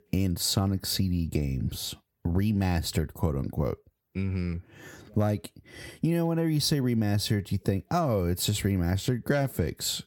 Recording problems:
squashed, flat; heavily

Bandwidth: 17.5 kHz